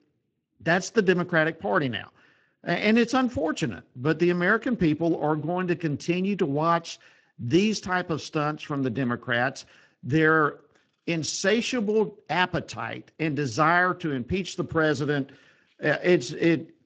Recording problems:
garbled, watery; slightly; nothing above 7.5 kHz

